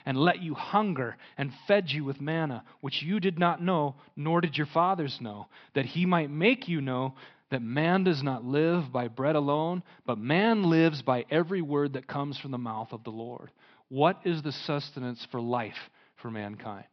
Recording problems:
high frequencies cut off; noticeable; nothing above 5.5 kHz

